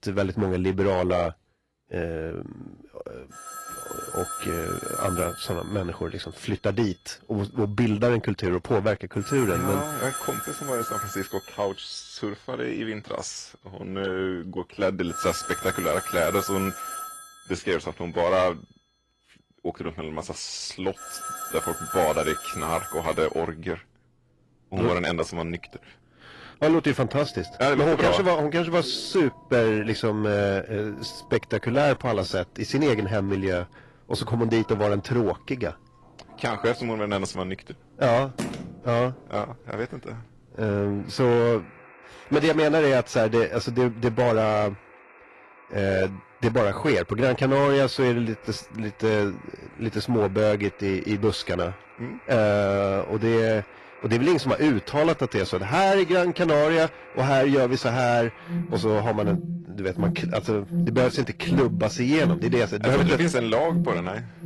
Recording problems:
distortion; slight; 5% of the sound clipped
garbled, watery; slightly; nothing above 11.5 kHz
alarms or sirens; loud; throughout; 9 dB below the speech
phone ringing; noticeable; at 38 s; peak 8 dB below the speech

